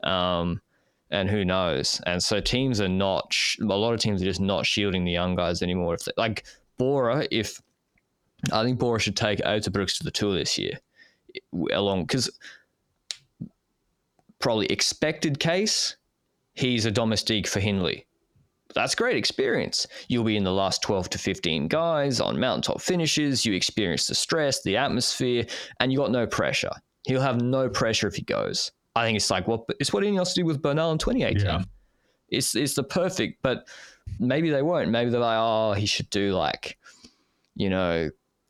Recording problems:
squashed, flat; heavily

